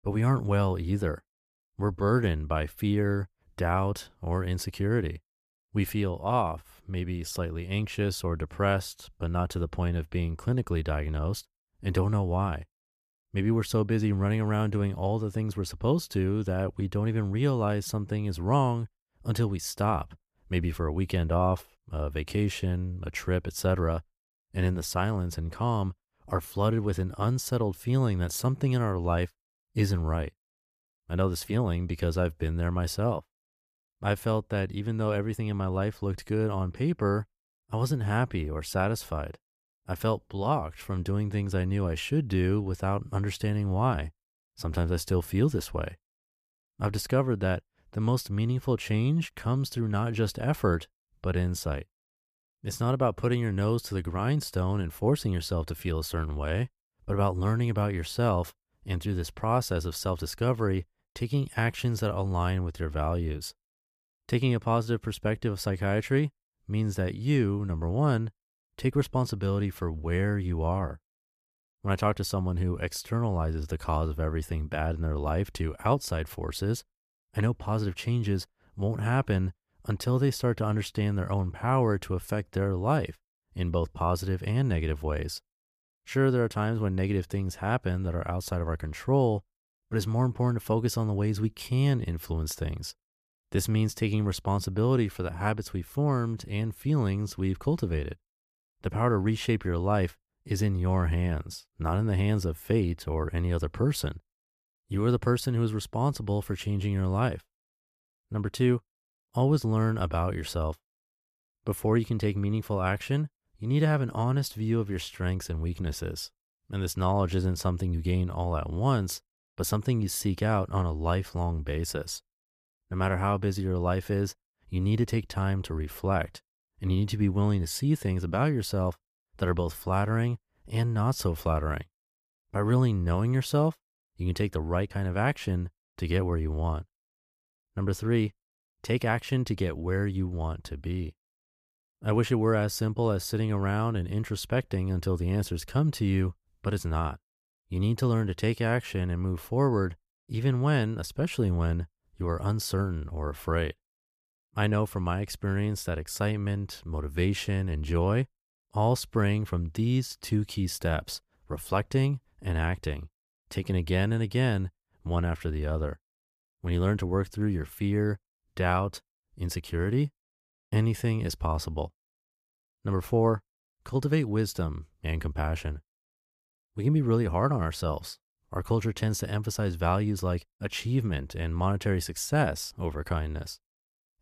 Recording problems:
none

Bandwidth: 14.5 kHz